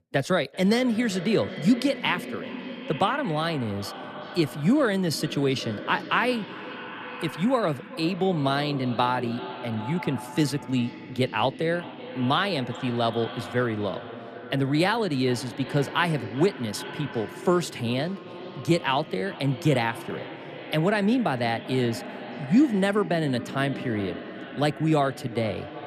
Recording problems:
echo of what is said; noticeable; throughout; 390 ms later, 10 dB below the speech

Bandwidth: 14.5 kHz